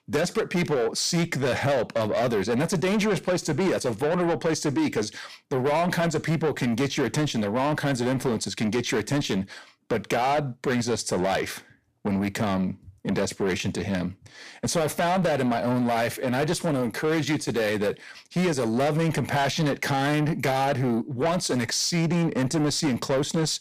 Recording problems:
distortion; heavy; 7 dB below the speech

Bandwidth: 15 kHz